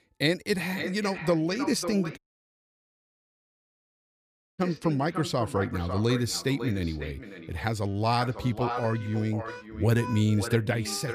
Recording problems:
echo of what is said; strong; throughout; 550 ms later, 10 dB below the speech
background music; noticeable; throughout; 15 dB below the speech
audio cutting out; at 2 s for 2.5 s

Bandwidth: 15 kHz